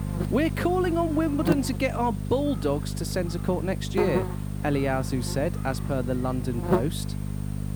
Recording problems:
electrical hum; loud; throughout; 50 Hz, 7 dB below the speech

